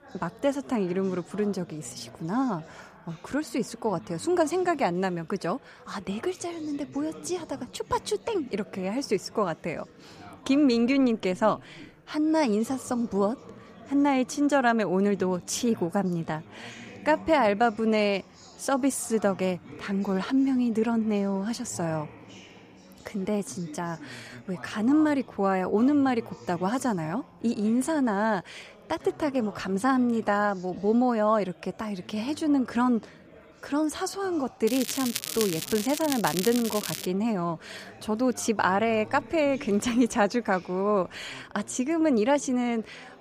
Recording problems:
crackling; loud; from 35 to 37 s; 6 dB below the speech
chatter from many people; faint; throughout; 20 dB below the speech

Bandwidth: 15 kHz